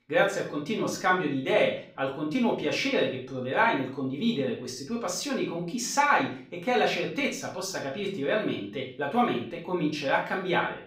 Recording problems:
off-mic speech; far
room echo; slight; dies away in 0.4 s

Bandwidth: 15.5 kHz